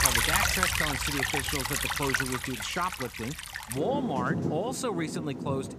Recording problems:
rain or running water; very loud; throughout; 3 dB above the speech

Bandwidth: 14.5 kHz